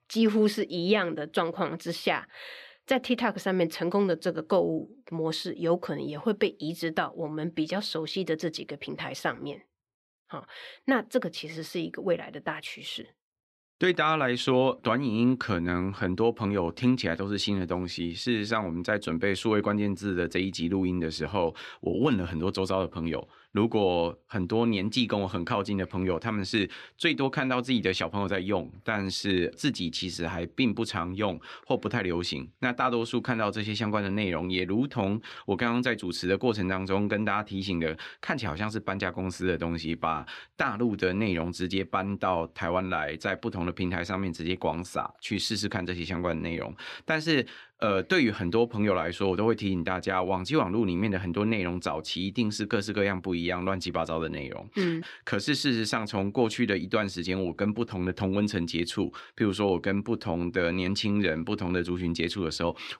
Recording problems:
none

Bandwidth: 13.5 kHz